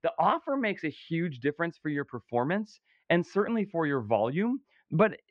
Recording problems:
muffled; very; fading above 2.5 kHz

